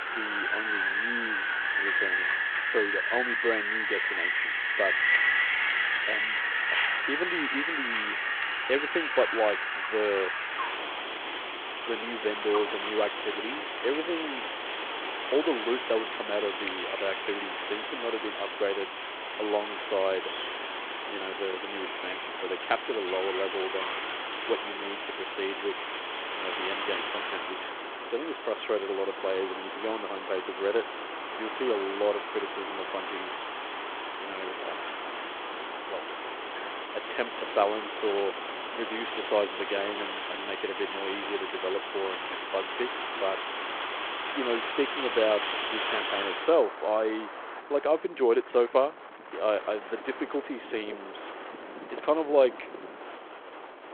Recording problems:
phone-call audio
wind in the background; very loud; throughout; as loud as the speech

